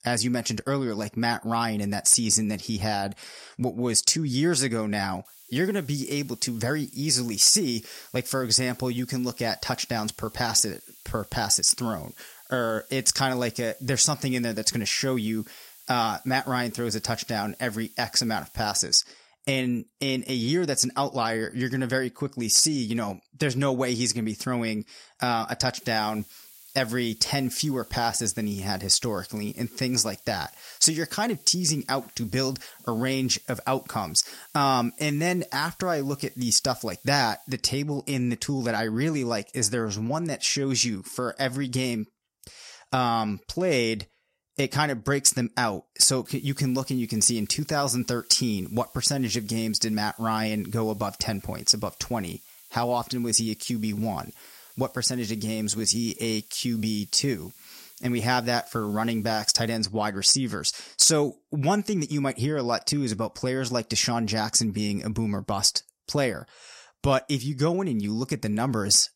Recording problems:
hiss; faint; from 5.5 to 19 s, from 26 to 38 s and from 46 s to 1:00; 25 dB below the speech

